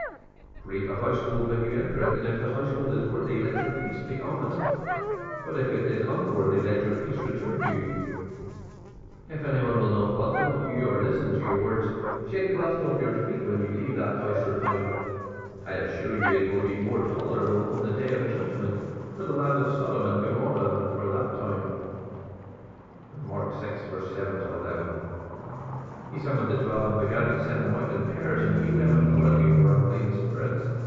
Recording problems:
room echo; strong; dies away in 2.4 s
off-mic speech; far
muffled; very slightly; fading above 2.5 kHz
high frequencies cut off; slight; nothing above 7.5 kHz
animal sounds; loud; throughout; 2 dB below the speech
electrical hum; faint; throughout; 50 Hz, 25 dB below the speech

